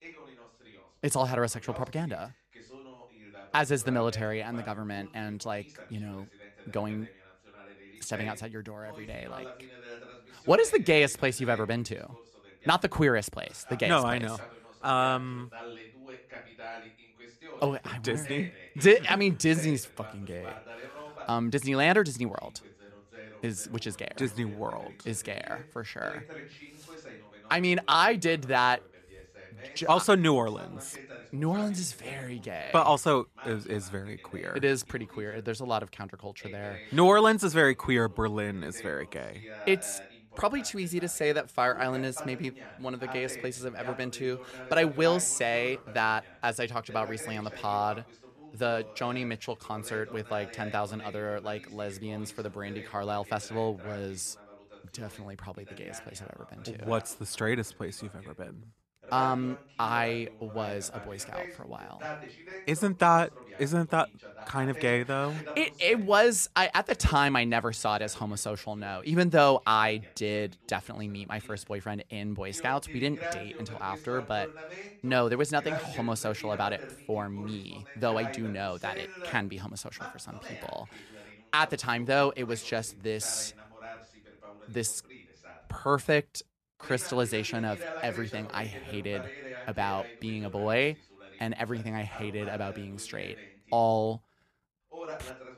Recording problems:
voice in the background; noticeable; throughout; 15 dB below the speech

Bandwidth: 13.5 kHz